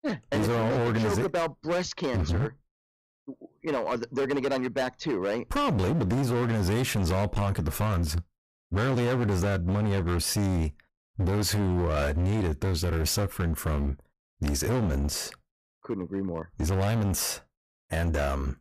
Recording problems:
distortion; heavy; 24% of the sound clipped

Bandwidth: 14.5 kHz